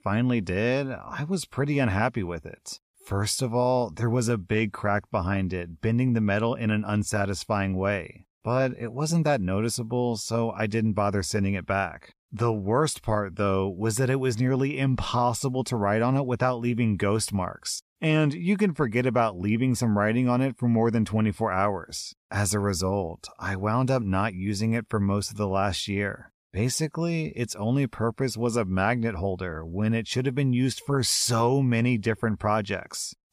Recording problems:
none

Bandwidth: 14.5 kHz